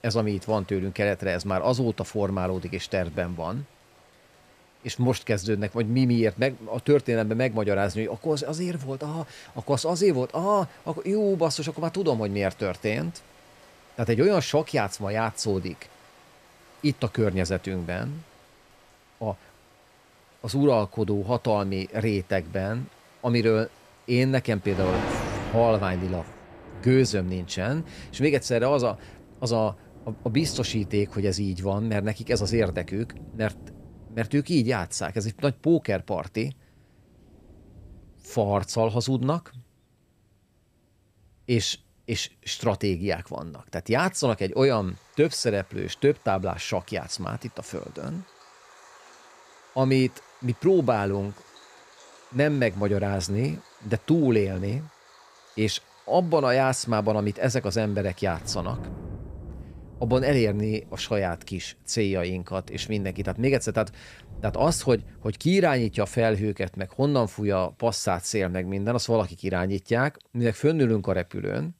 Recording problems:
rain or running water; noticeable; throughout; 20 dB below the speech

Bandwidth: 14.5 kHz